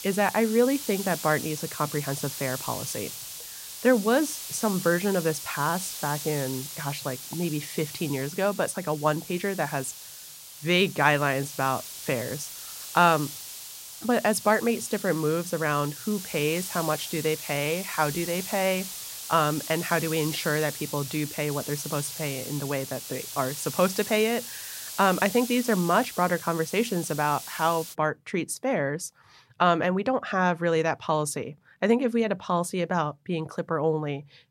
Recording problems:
hiss; loud; until 28 s; 9 dB below the speech

